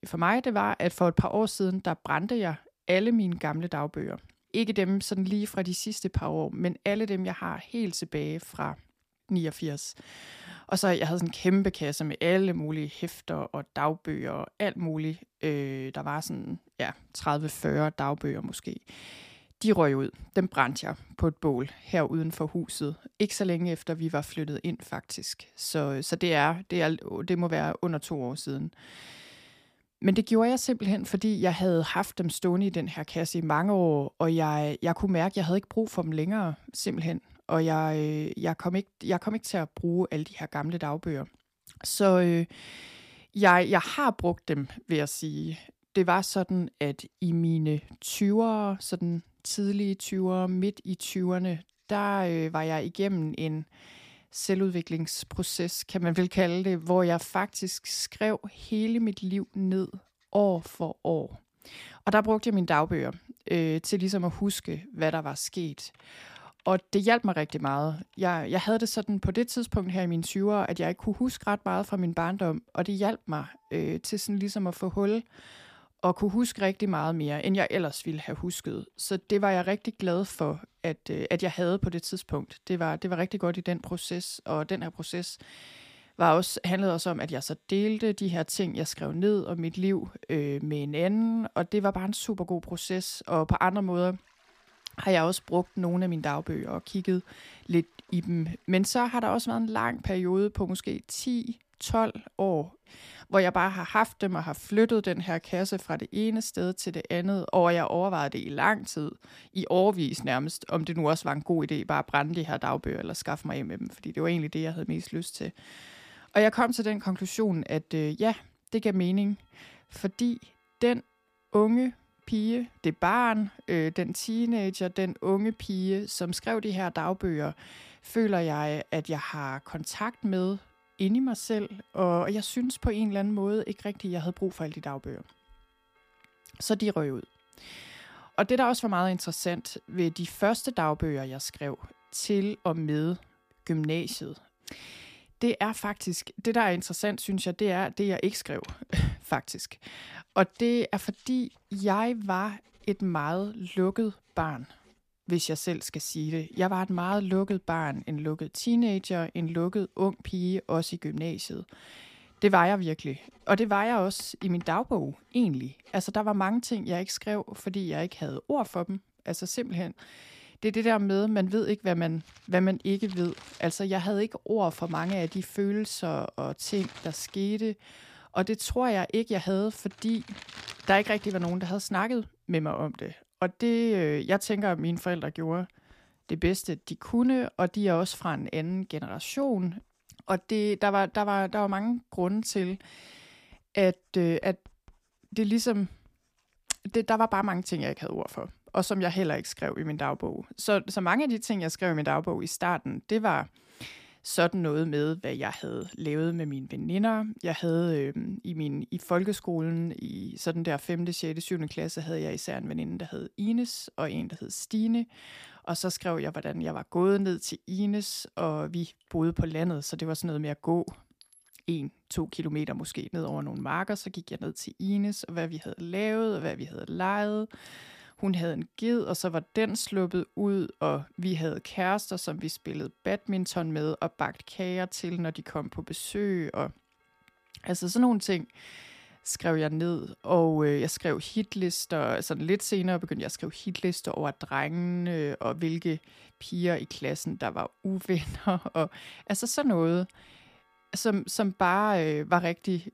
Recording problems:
household noises; faint; throughout; 30 dB below the speech

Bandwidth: 15 kHz